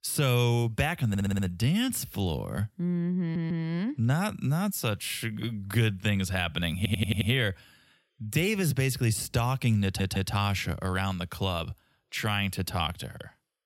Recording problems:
audio stuttering; 4 times, first at 1 s

